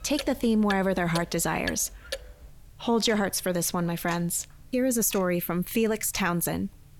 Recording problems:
household noises; noticeable; throughout; 15 dB below the speech

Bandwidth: 17 kHz